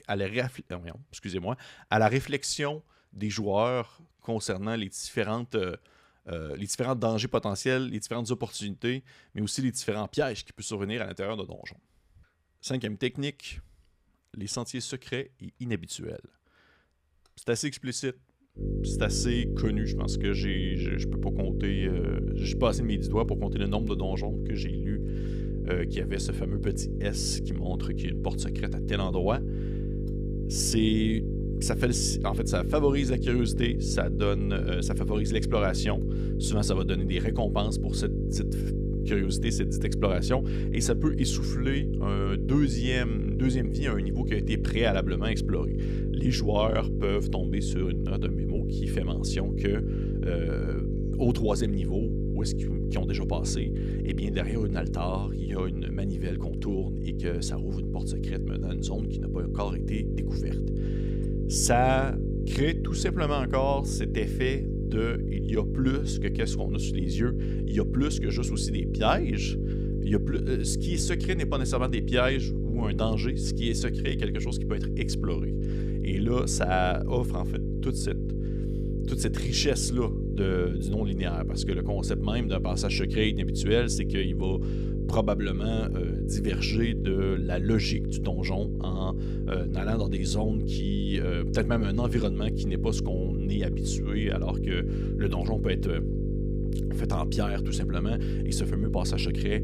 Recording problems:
electrical hum; loud; from 19 s on; 50 Hz, 6 dB below the speech

